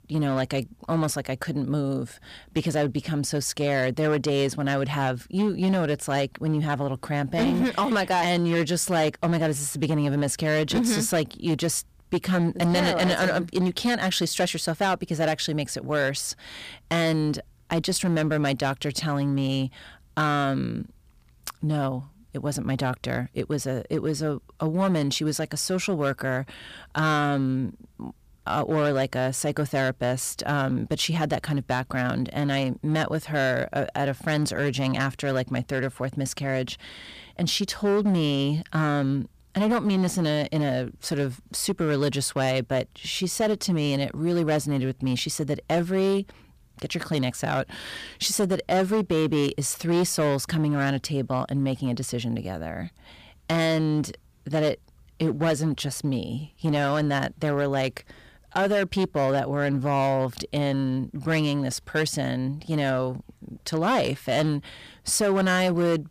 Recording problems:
distortion; slight; 8% of the sound clipped

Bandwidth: 15 kHz